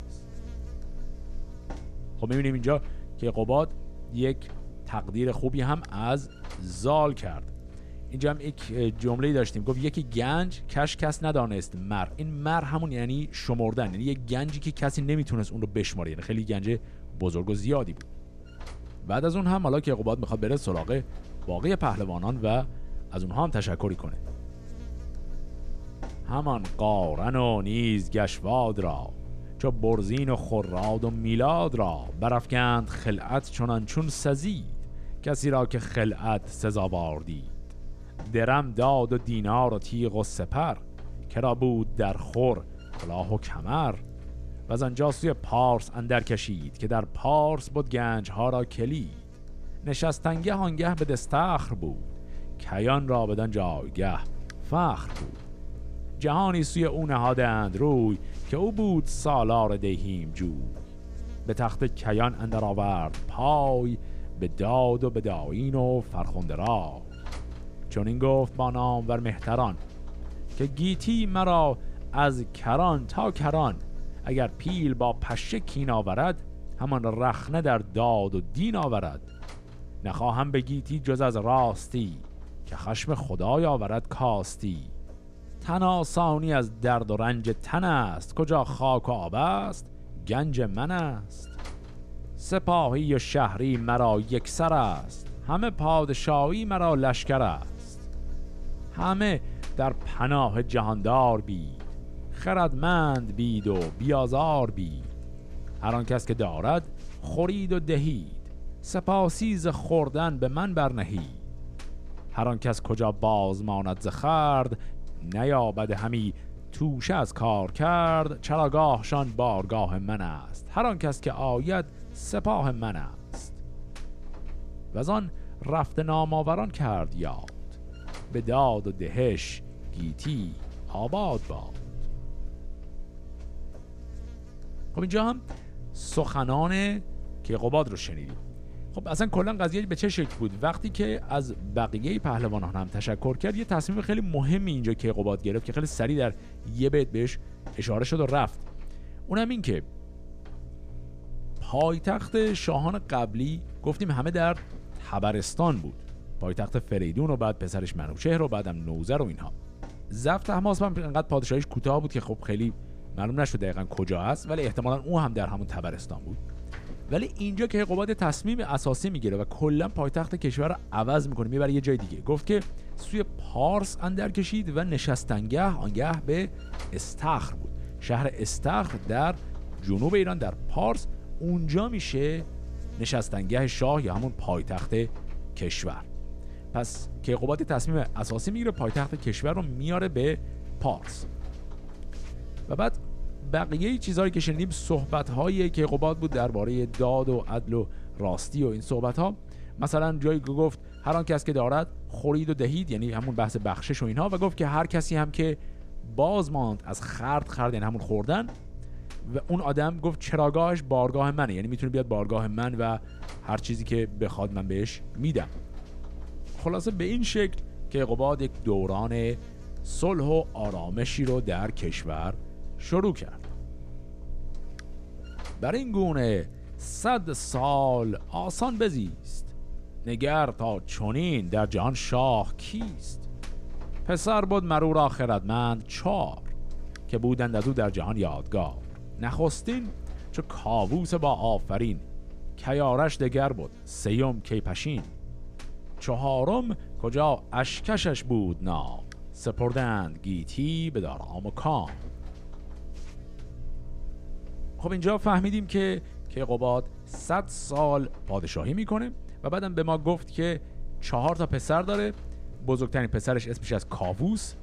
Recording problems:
electrical hum; faint; throughout; 60 Hz, 25 dB below the speech

